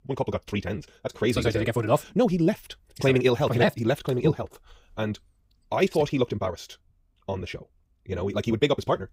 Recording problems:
wrong speed, natural pitch; too fast; 1.7 times normal speed

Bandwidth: 15.5 kHz